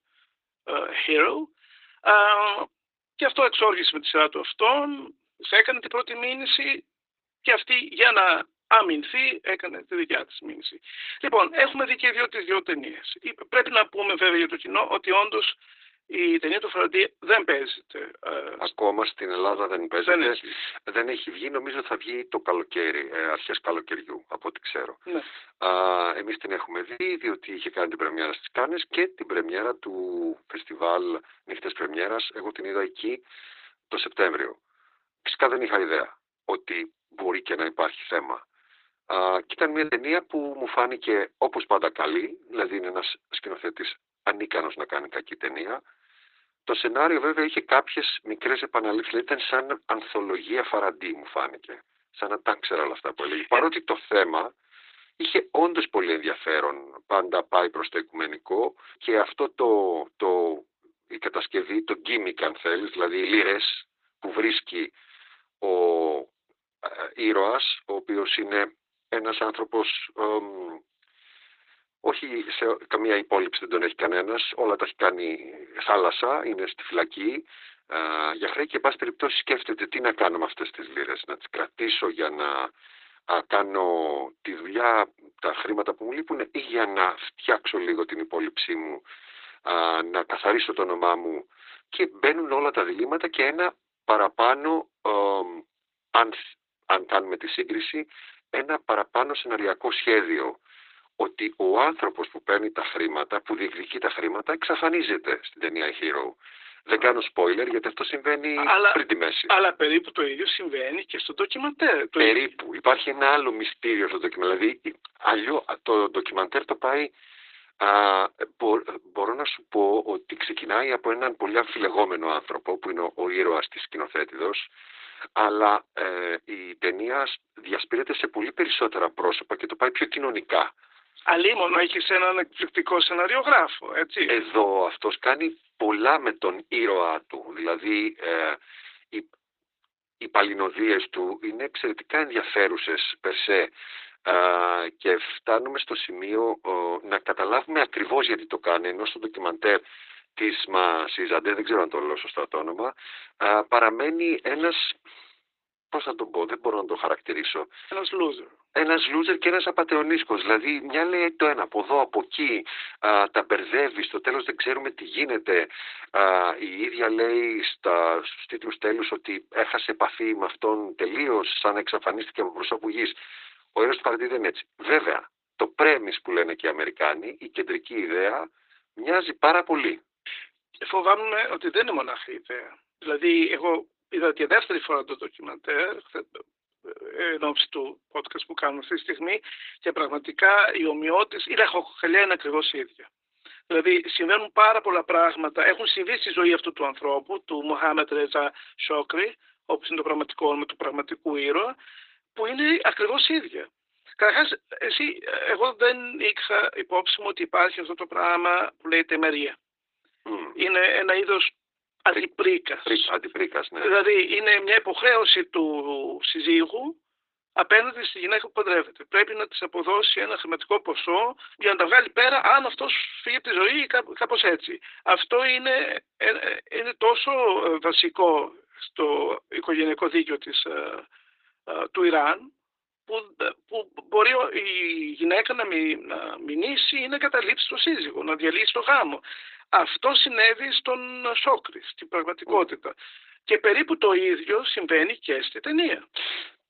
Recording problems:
garbled, watery; badly; nothing above 4 kHz
thin; very; fading below 300 Hz
choppy; occasionally; at 27 s and at 40 s; 3% of the speech affected

